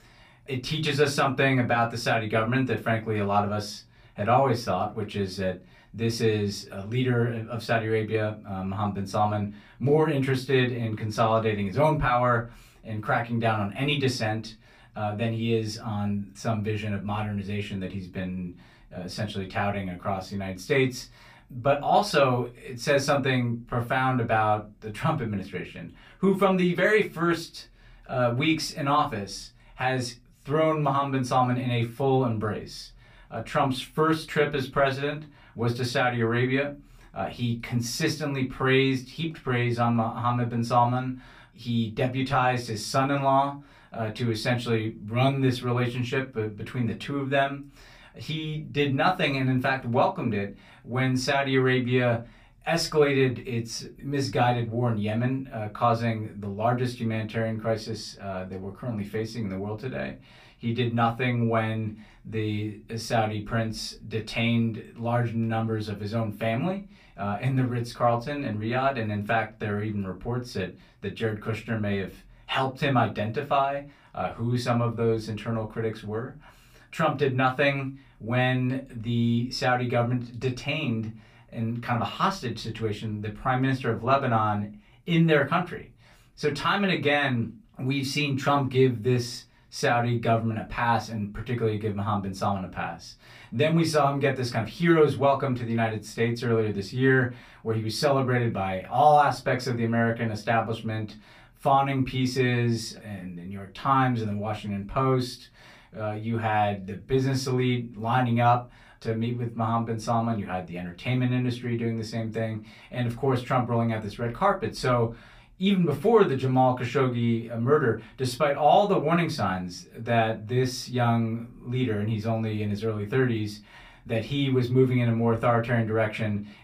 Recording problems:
off-mic speech; far
room echo; very slight; dies away in 0.2 s

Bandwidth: 15 kHz